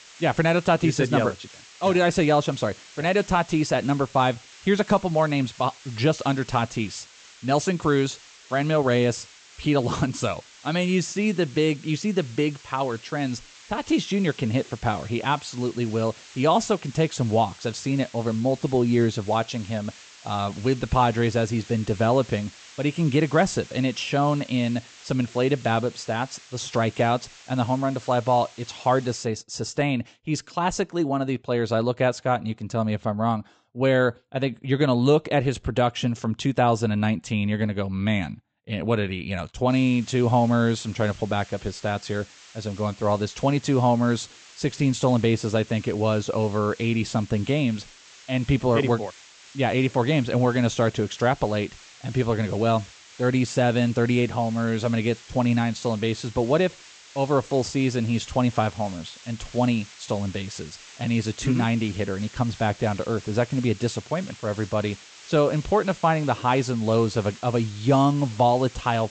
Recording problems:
high frequencies cut off; noticeable; nothing above 8 kHz
hiss; faint; until 29 s and from 40 s on; 20 dB below the speech

